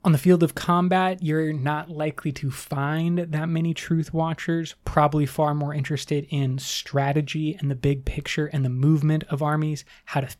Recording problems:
none

